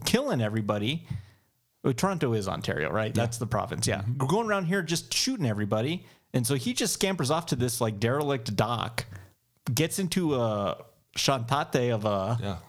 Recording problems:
squashed, flat; somewhat

